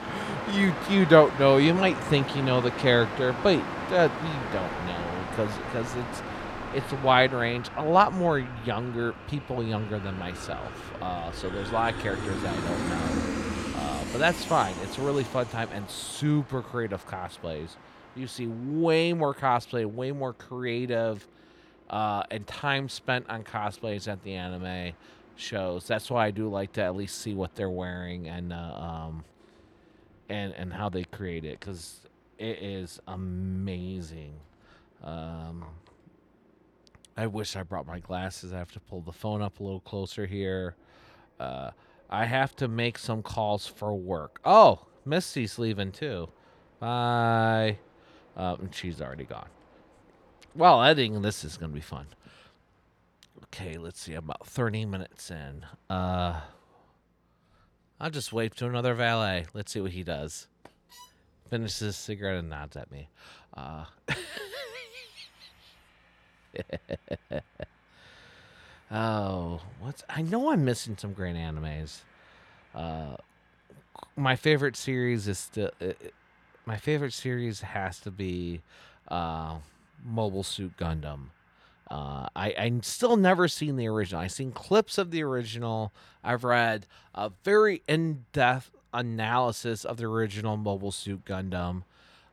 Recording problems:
train or aircraft noise; loud; throughout; 7 dB below the speech

